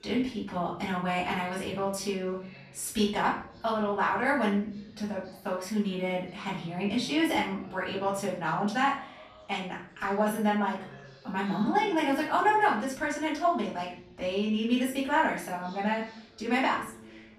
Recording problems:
off-mic speech; far
room echo; noticeable; dies away in 0.5 s
background chatter; faint; throughout; 4 voices, 25 dB below the speech

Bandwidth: 14 kHz